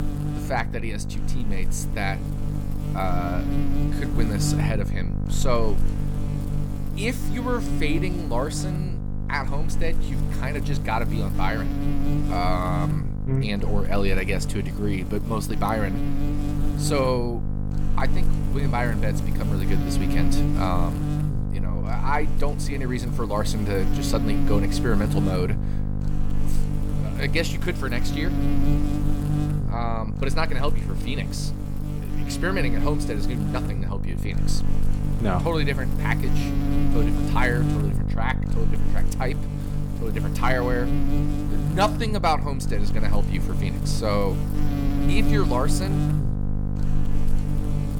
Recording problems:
electrical hum; loud; throughout; 50 Hz, 6 dB below the speech

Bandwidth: 18.5 kHz